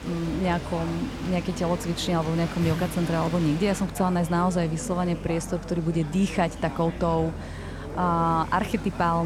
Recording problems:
rain or running water; noticeable; throughout; 15 dB below the speech
chatter from many people; noticeable; throughout; 15 dB below the speech
low rumble; faint; throughout; 25 dB below the speech
abrupt cut into speech; at the end

